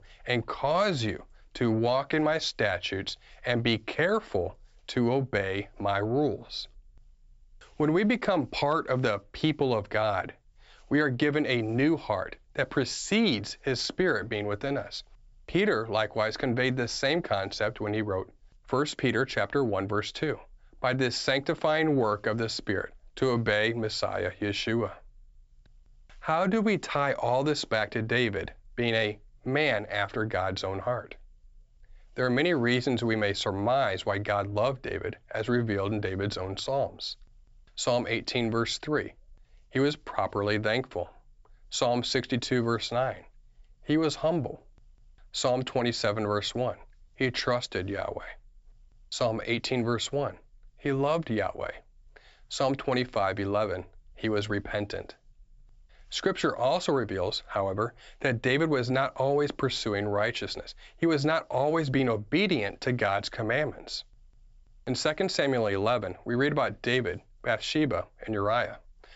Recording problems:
high frequencies cut off; noticeable; nothing above 8 kHz

